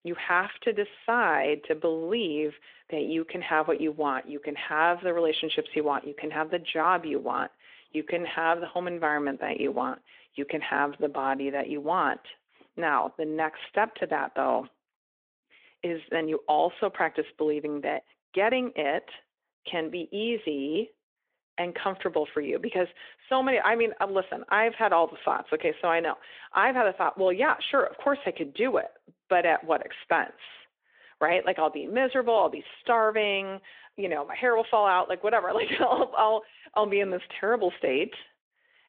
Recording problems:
phone-call audio

